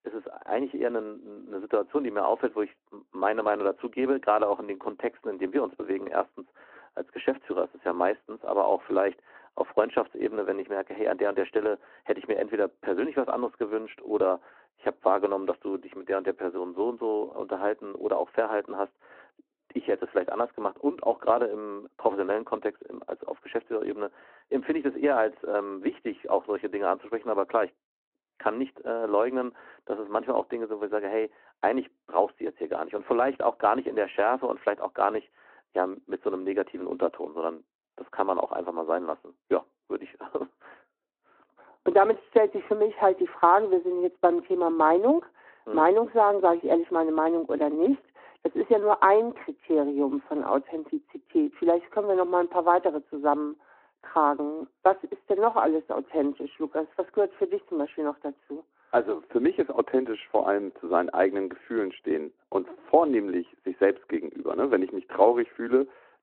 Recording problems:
phone-call audio; nothing above 3.5 kHz
muffled; very slightly; fading above 3.5 kHz

